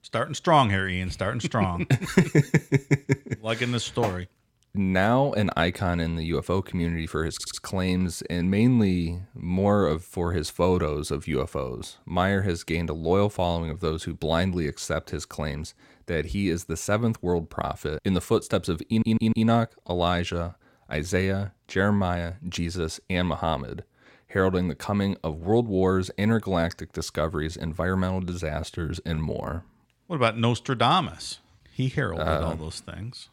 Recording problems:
audio stuttering; at 7.5 s and at 19 s

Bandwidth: 16.5 kHz